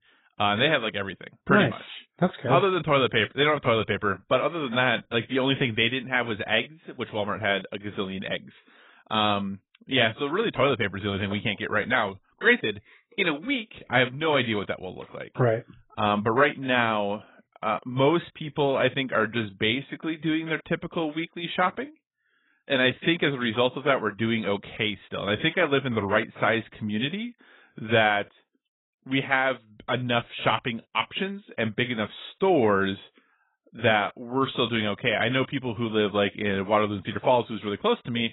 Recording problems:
garbled, watery; badly; nothing above 3.5 kHz

